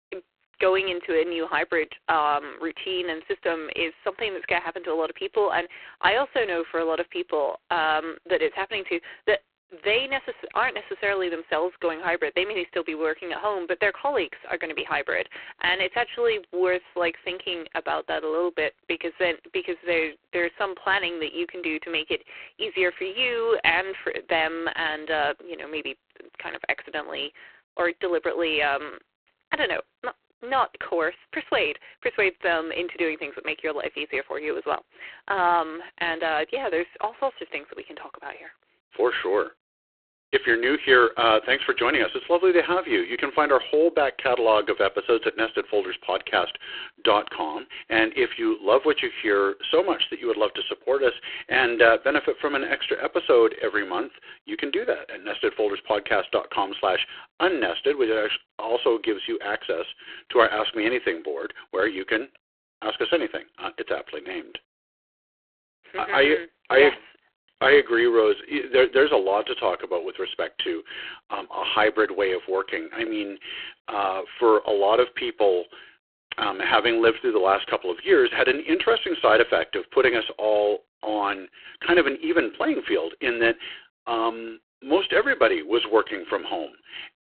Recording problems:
phone-call audio; poor line

